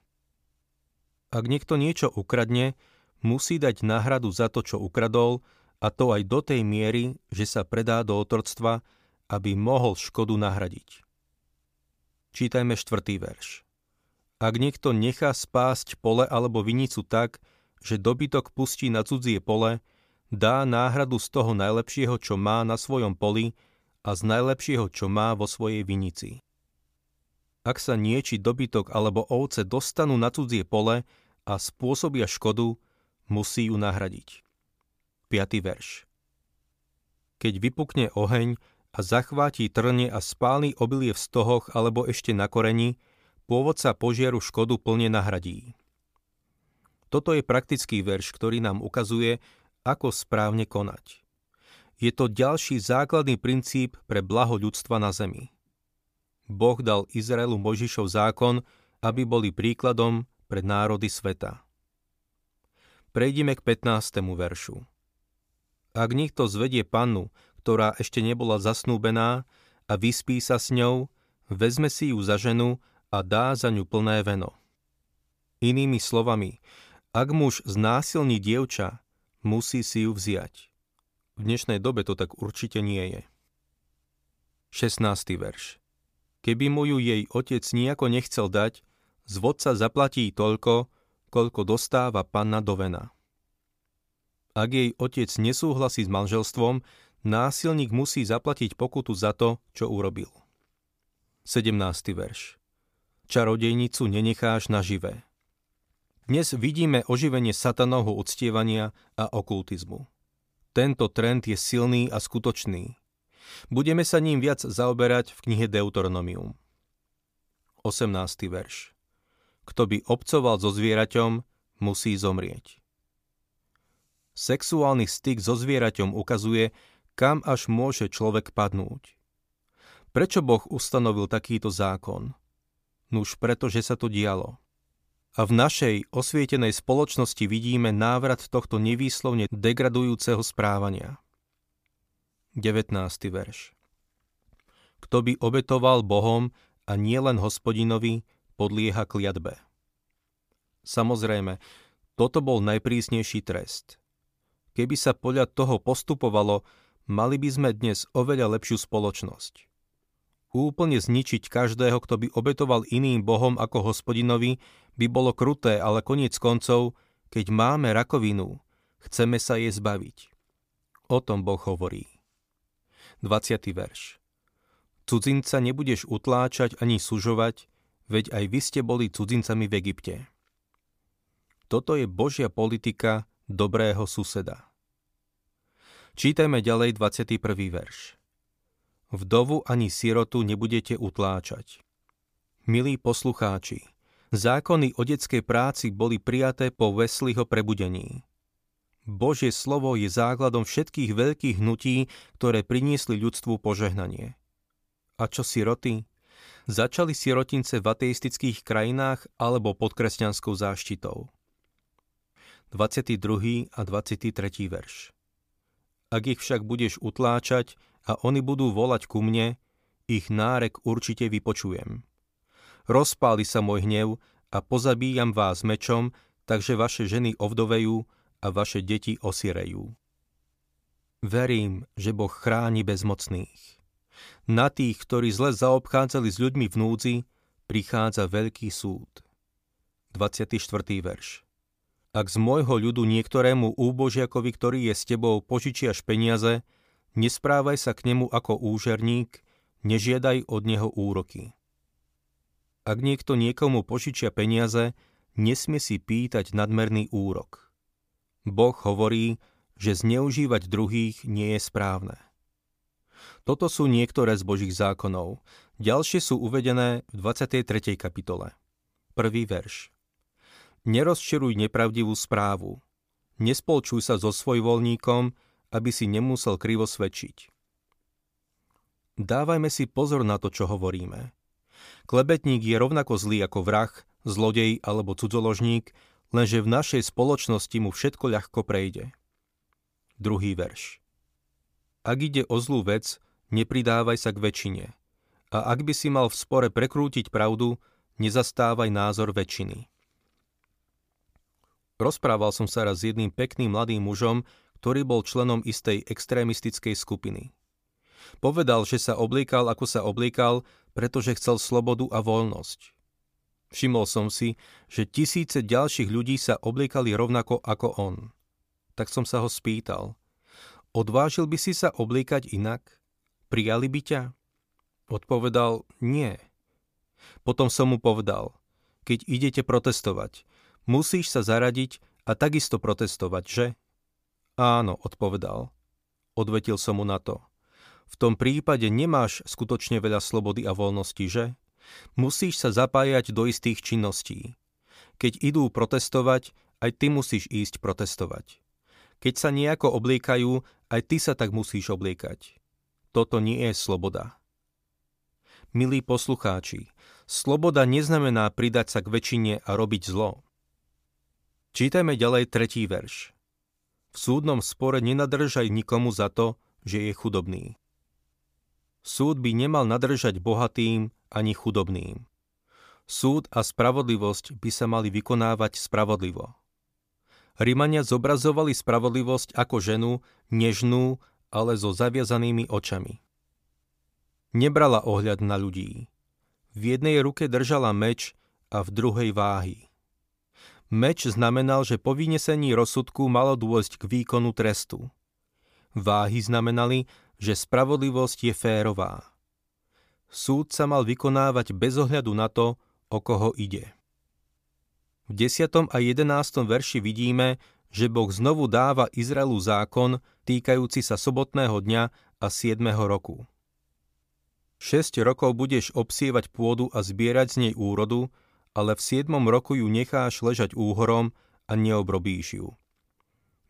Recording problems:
none

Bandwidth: 15 kHz